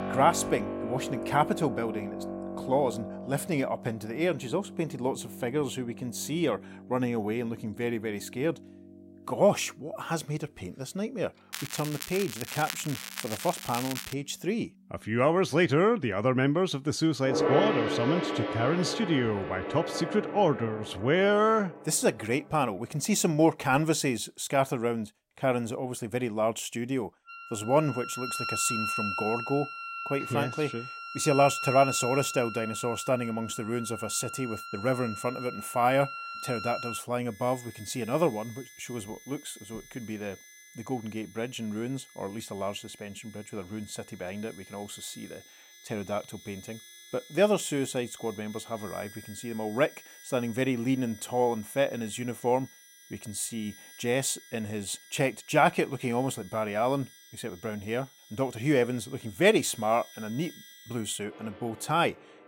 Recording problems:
background music; loud; throughout; 8 dB below the speech
crackling; loud; from 12 to 14 s; 8 dB below the speech

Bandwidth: 16 kHz